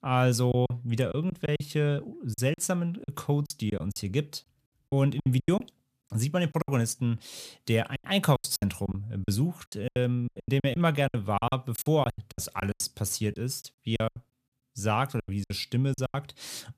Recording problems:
choppy; very; 15% of the speech affected

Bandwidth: 14.5 kHz